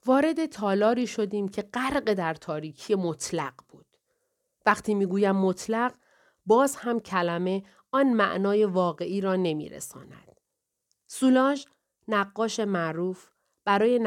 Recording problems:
abrupt cut into speech; at the end

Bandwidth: 18.5 kHz